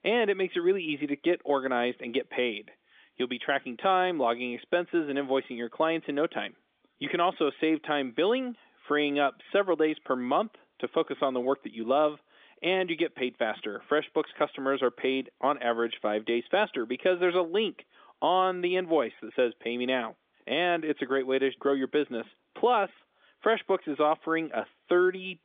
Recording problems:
phone-call audio; nothing above 3.5 kHz

